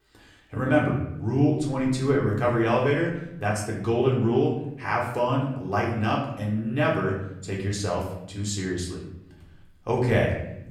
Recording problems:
off-mic speech; far
room echo; noticeable; dies away in 0.8 s

